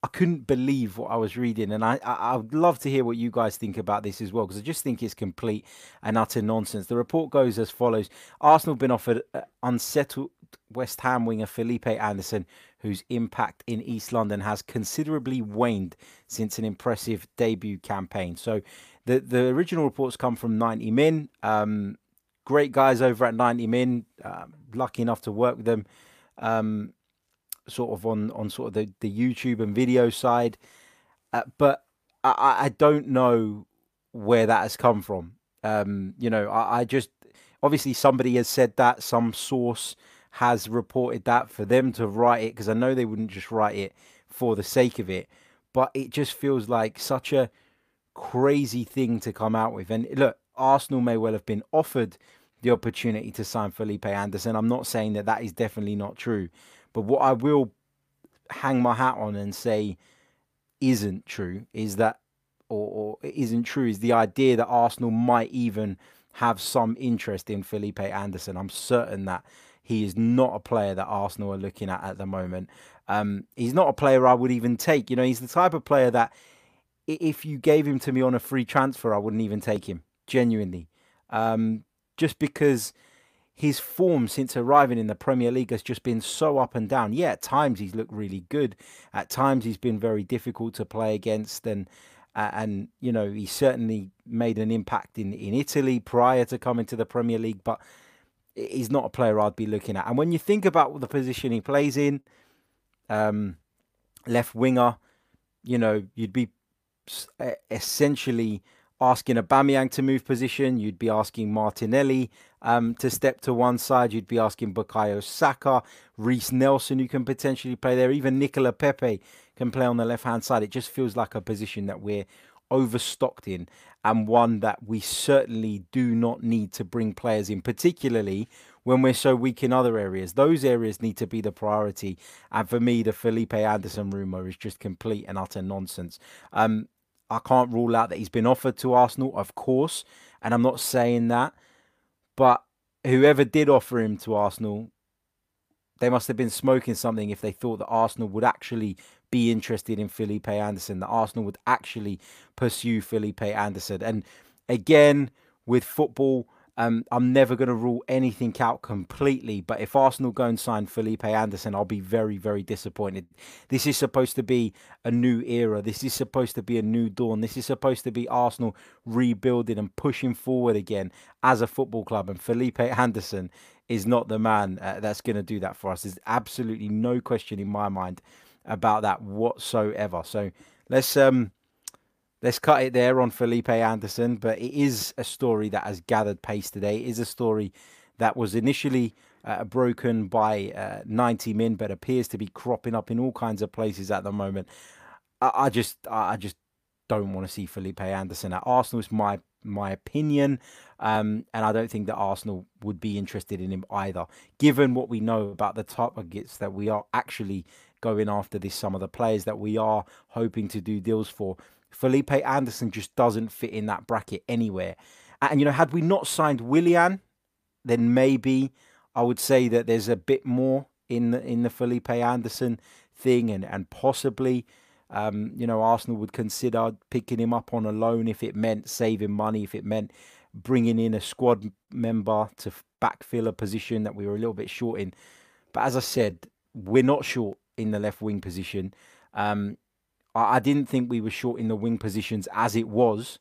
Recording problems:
uneven, jittery; strongly; from 37 s to 3:57

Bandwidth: 15 kHz